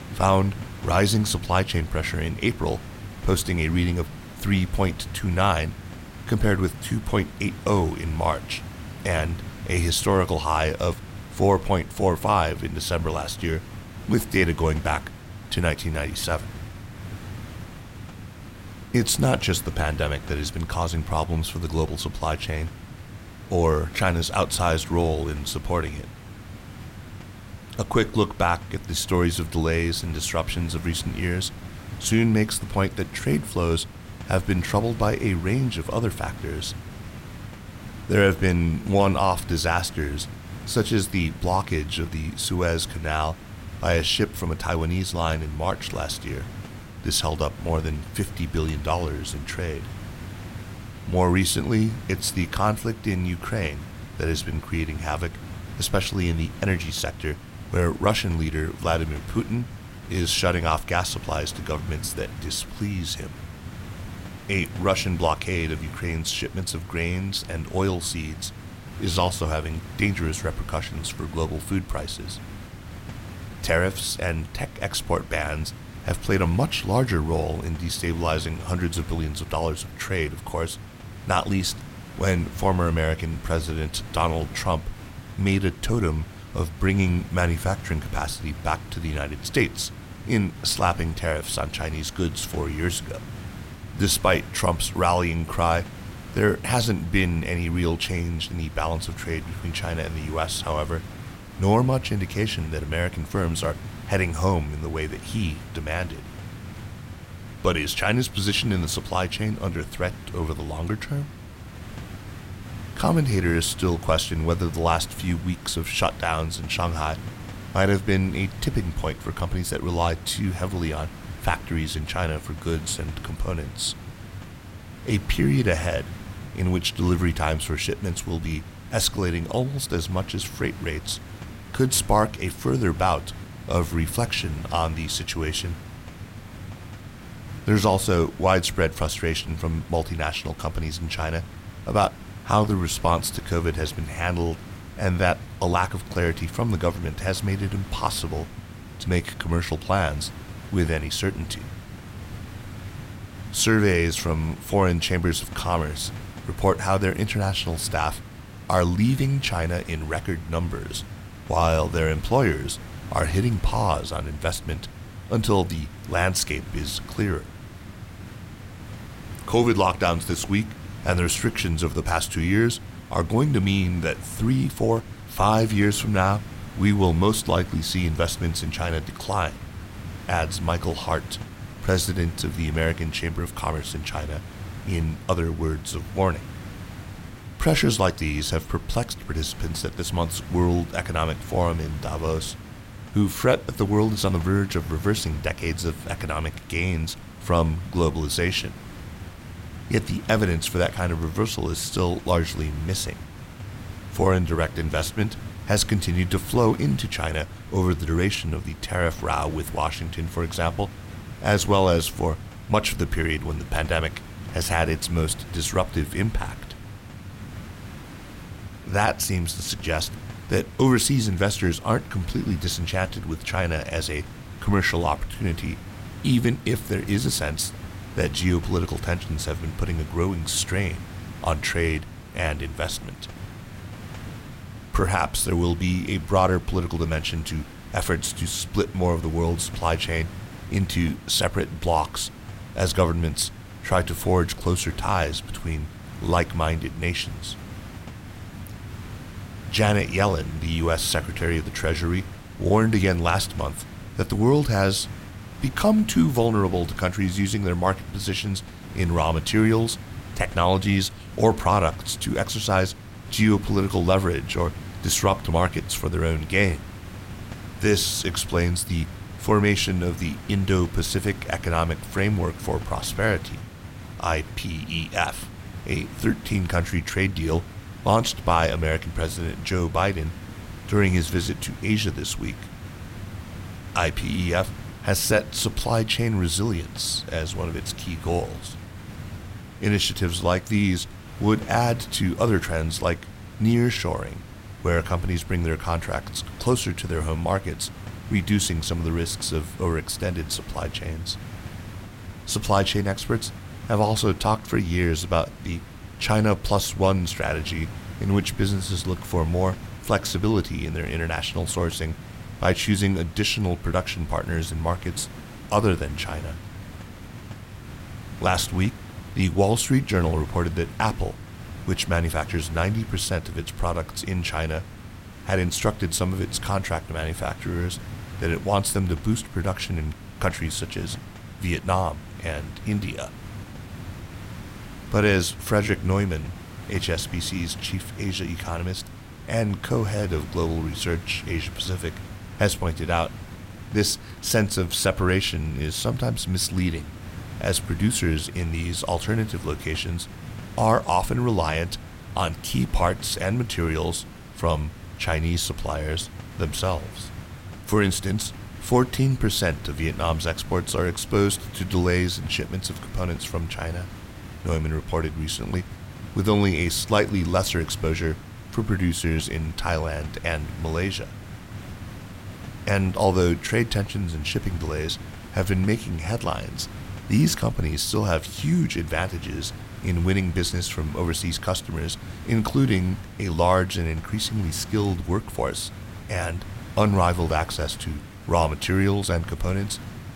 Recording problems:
hiss; noticeable; throughout; 15 dB below the speech

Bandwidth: 16 kHz